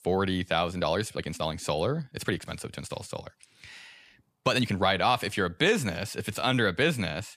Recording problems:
uneven, jittery; strongly; from 0.5 to 6.5 s

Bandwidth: 14.5 kHz